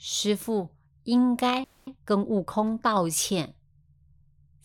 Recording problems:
audio freezing; at 1.5 s

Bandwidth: 17 kHz